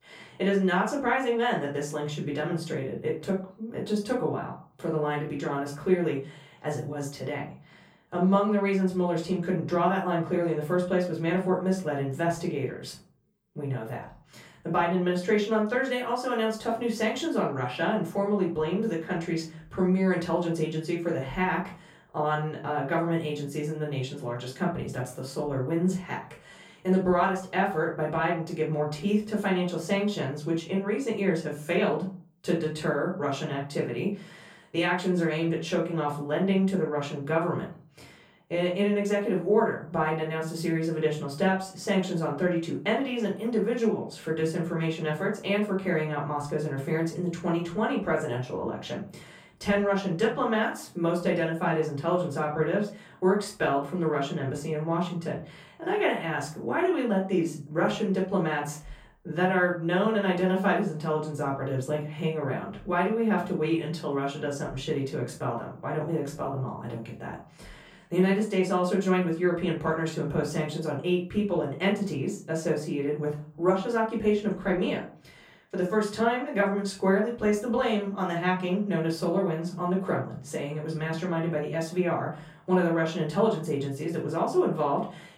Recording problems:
off-mic speech; far
room echo; slight; dies away in 0.3 s

